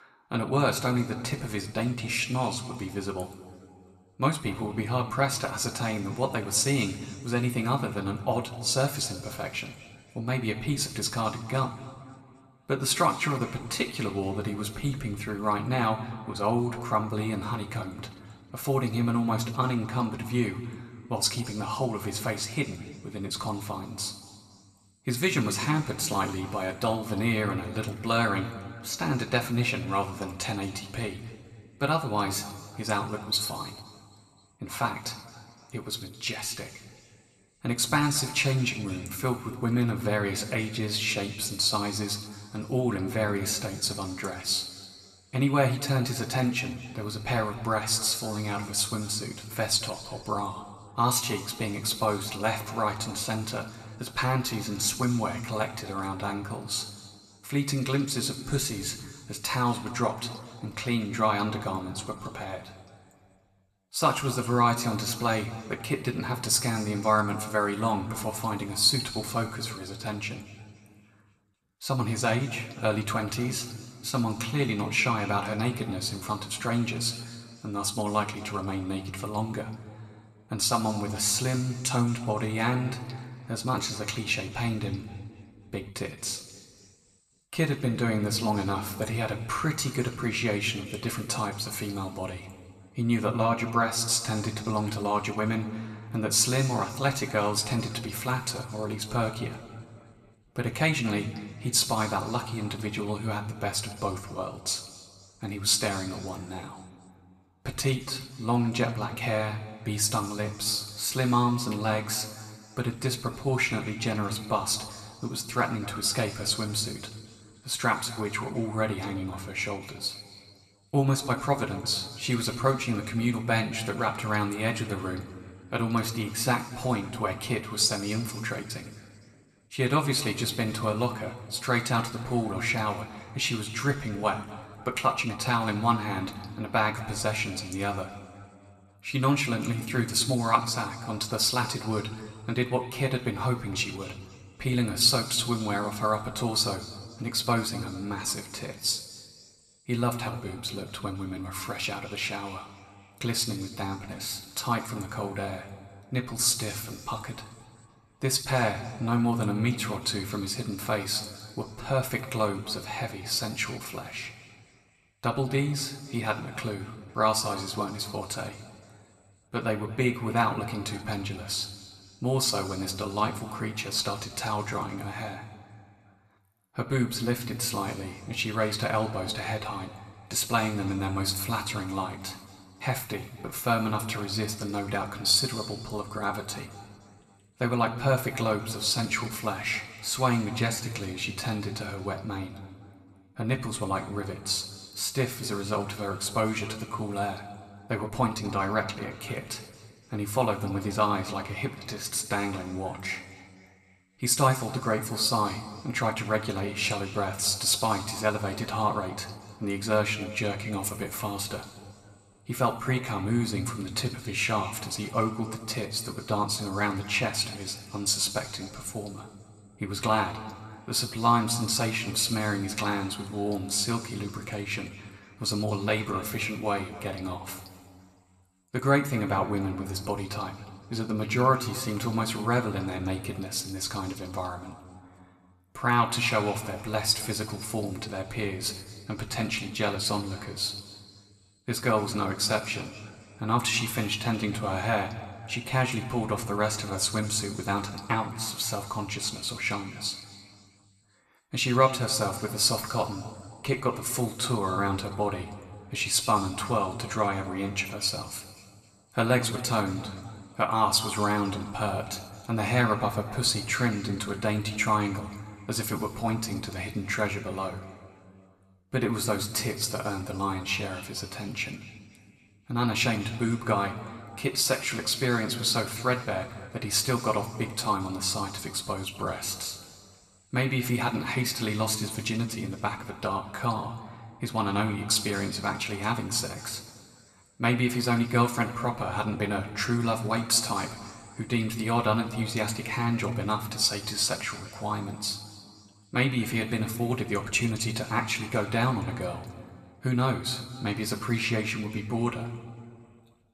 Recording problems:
room echo; slight; dies away in 1.9 s
off-mic speech; somewhat distant

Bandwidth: 14 kHz